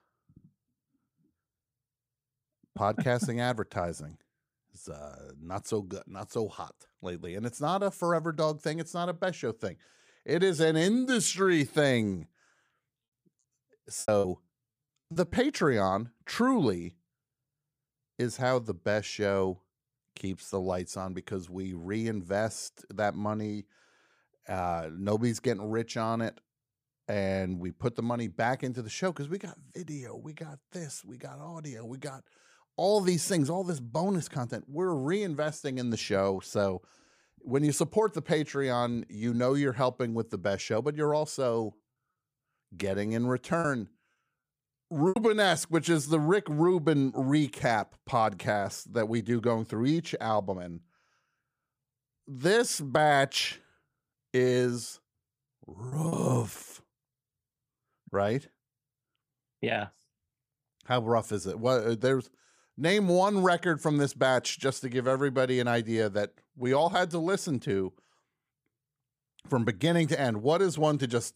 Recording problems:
choppy; very; from 14 to 15 s, from 44 to 45 s and at 56 s; 9% of the speech affected

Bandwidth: 15 kHz